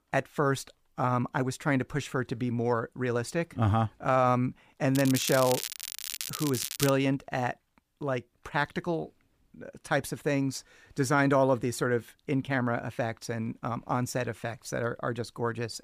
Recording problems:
crackling; loud; from 5 to 7 s; 5 dB below the speech

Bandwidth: 15 kHz